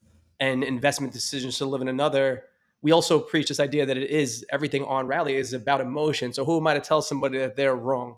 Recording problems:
uneven, jittery; strongly; from 1 to 7.5 s

